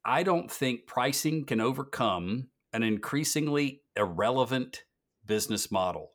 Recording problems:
none

